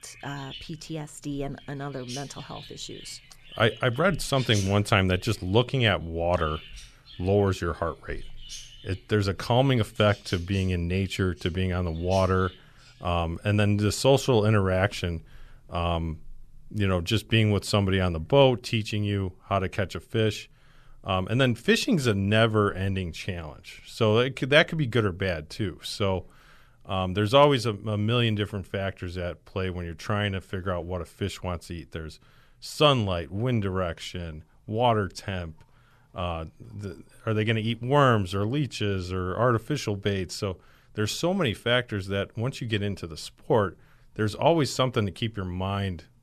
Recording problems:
animal sounds; noticeable; throughout; 20 dB below the speech

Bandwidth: 13.5 kHz